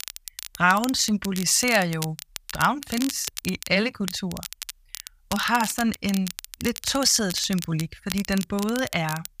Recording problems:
crackle, like an old record; noticeable; 10 dB below the speech

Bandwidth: 15 kHz